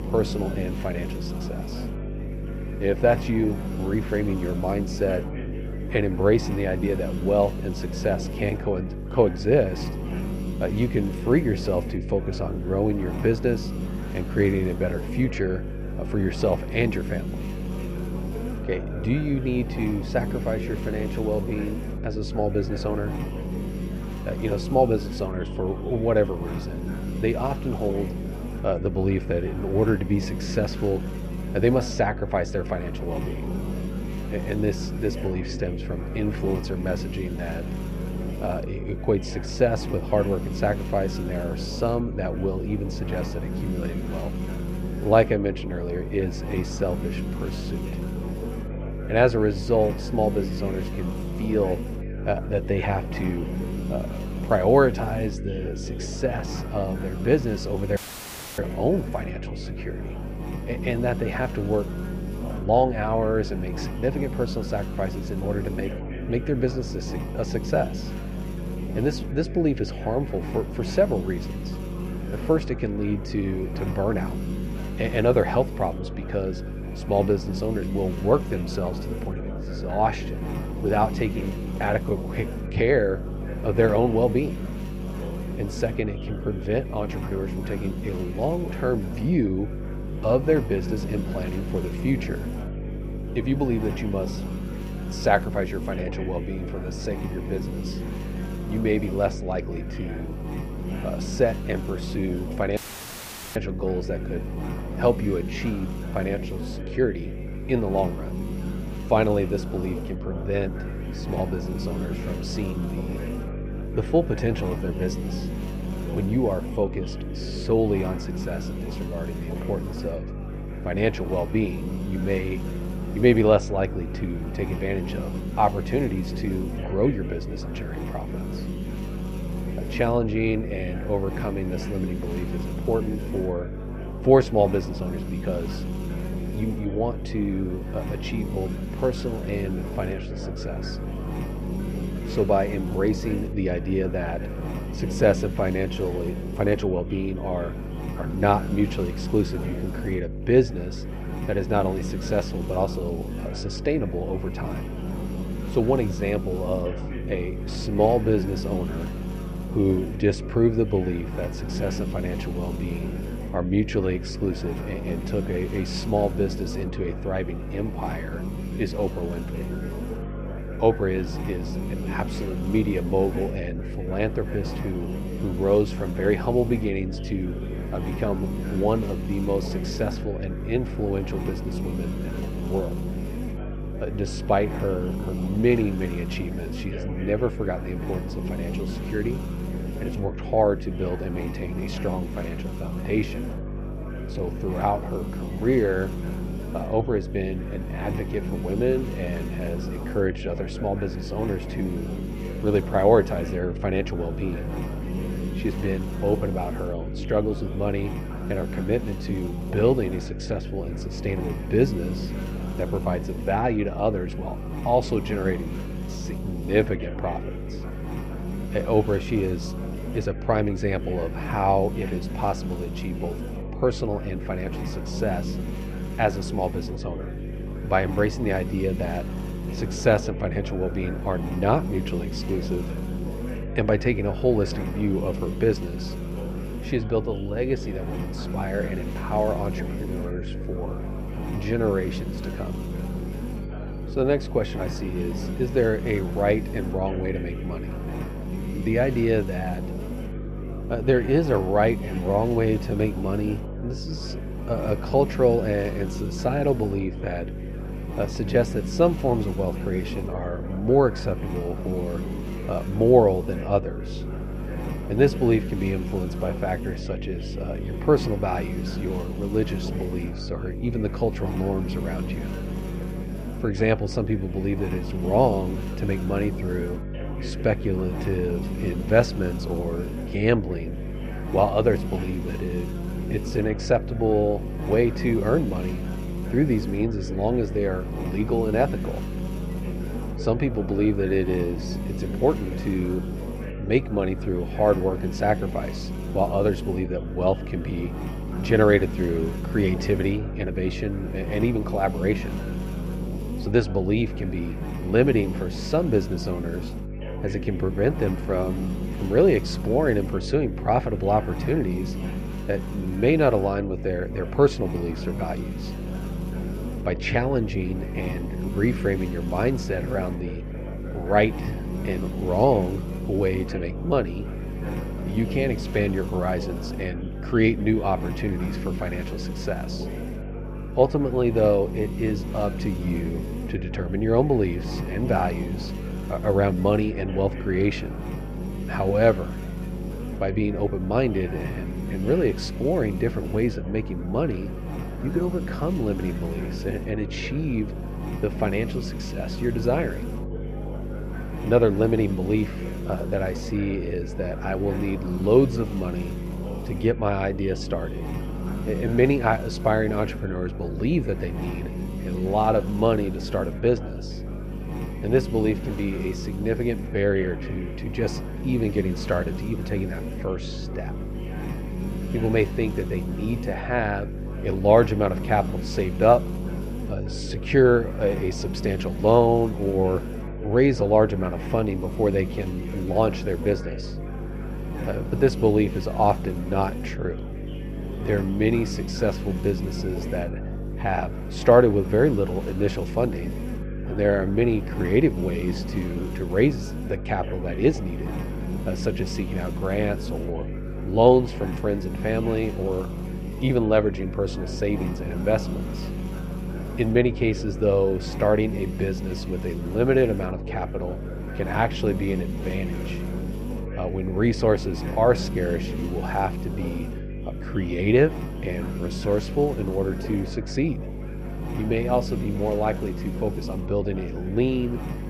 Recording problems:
muffled; very; fading above 2 kHz
electrical hum; noticeable; throughout; 50 Hz, 10 dB below the speech
chatter from many people; noticeable; throughout; 15 dB below the speech
audio cutting out; filled with static; at 58 s for 0.5 s and at 1:43 for 1 s

